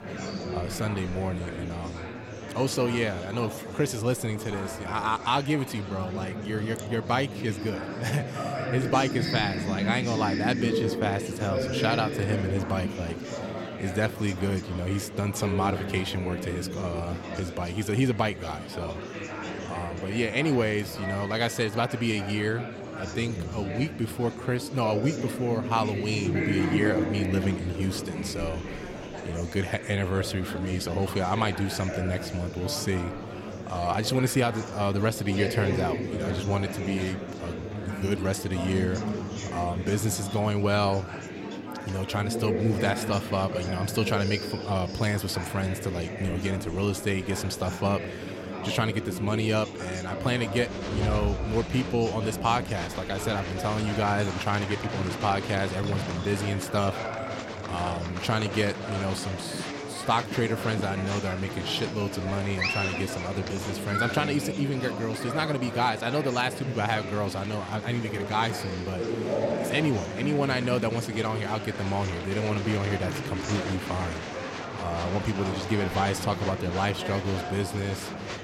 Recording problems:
murmuring crowd; loud; throughout; 5 dB below the speech

